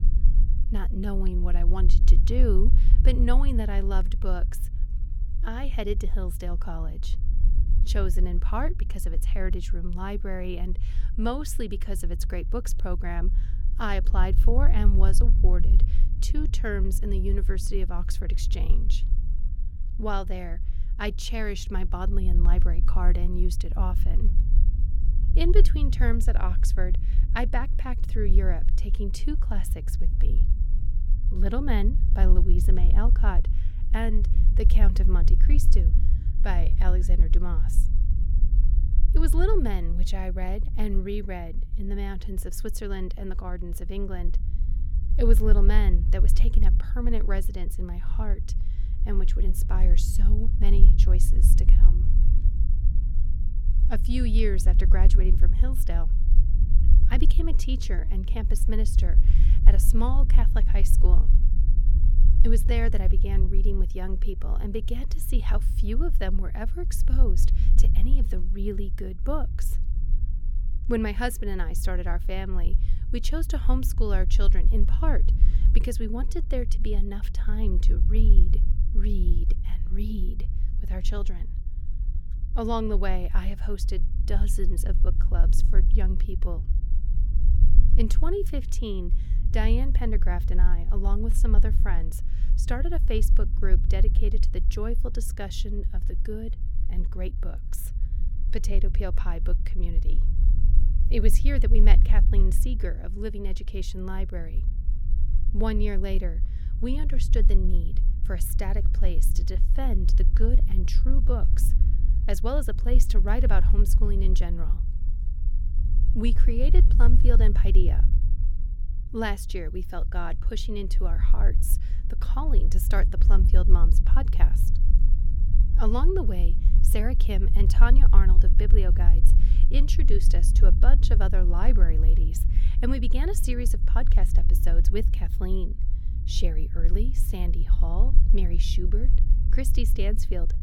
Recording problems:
low rumble; noticeable; throughout; 10 dB below the speech

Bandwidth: 17 kHz